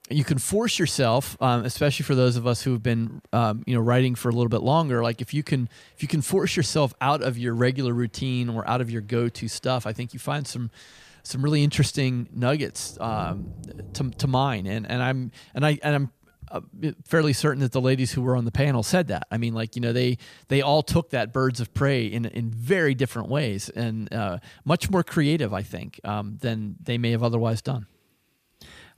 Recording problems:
rain or running water; noticeable; throughout; 15 dB below the speech

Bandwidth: 14.5 kHz